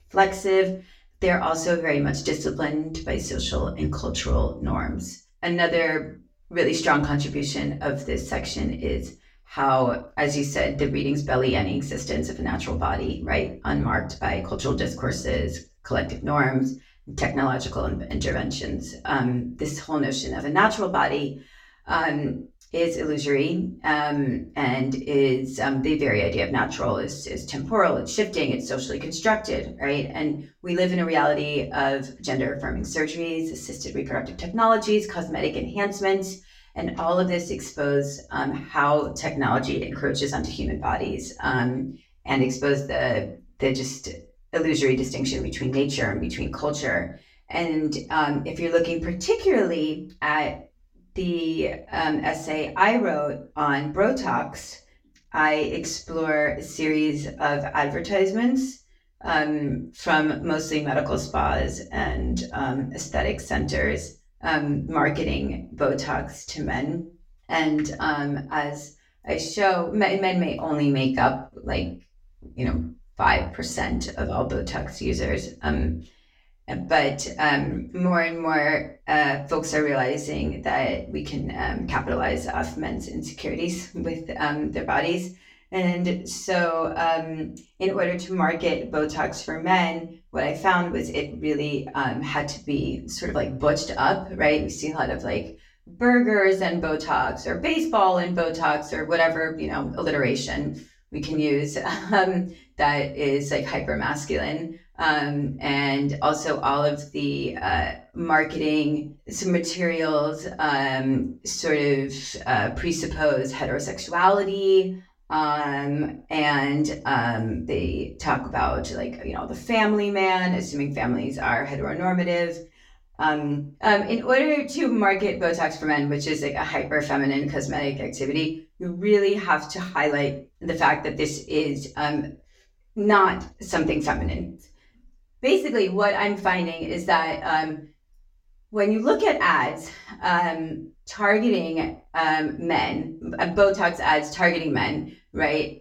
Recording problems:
off-mic speech; far
room echo; very slight; dies away in 0.3 s

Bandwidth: 17.5 kHz